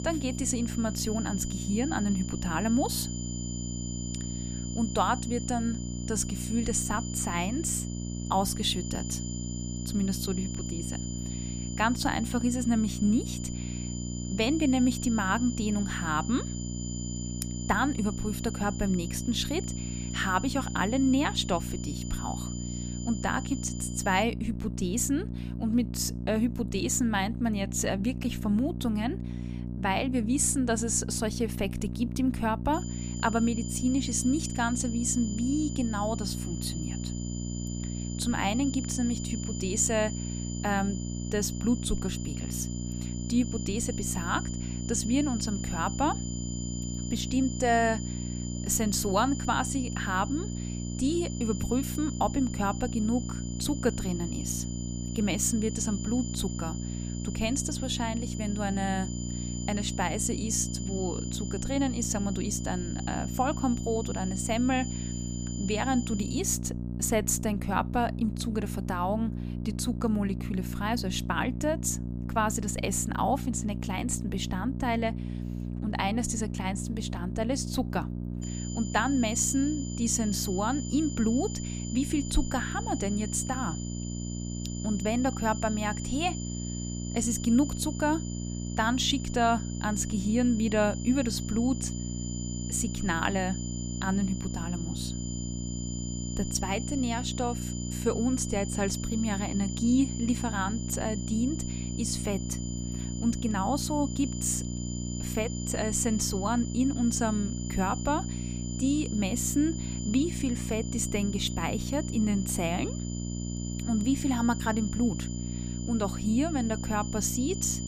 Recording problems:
electrical hum; noticeable; throughout; 60 Hz, 15 dB below the speech
high-pitched whine; noticeable; until 24 s, from 33 s to 1:06 and from 1:18 on; 7 kHz, 10 dB below the speech

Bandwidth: 15 kHz